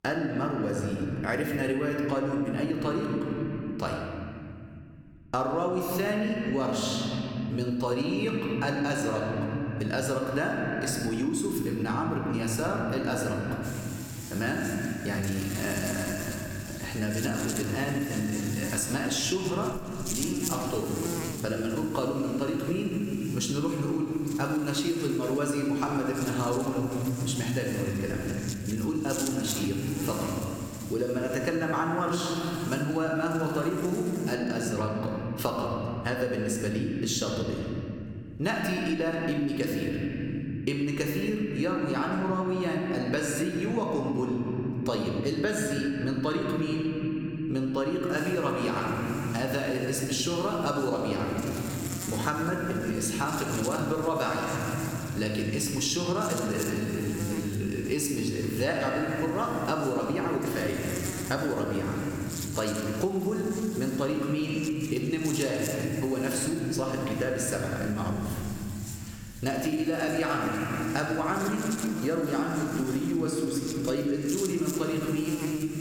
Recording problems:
room echo; noticeable; dies away in 2.7 s
off-mic speech; somewhat distant
squashed, flat; somewhat
electrical hum; noticeable; from 14 to 34 s and from 48 s on; 50 Hz, 10 dB below the speech

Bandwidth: 18.5 kHz